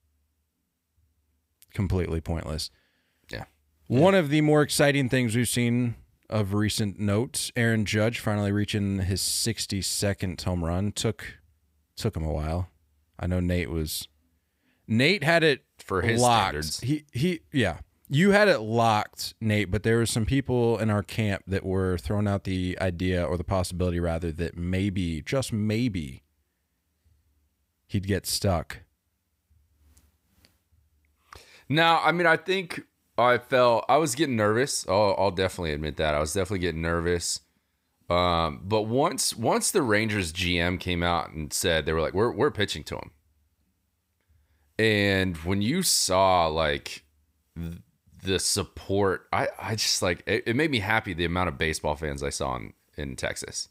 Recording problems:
none

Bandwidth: 15.5 kHz